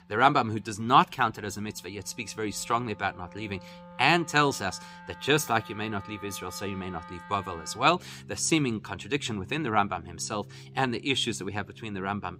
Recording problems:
background music; noticeable; throughout; 20 dB below the speech

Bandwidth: 15.5 kHz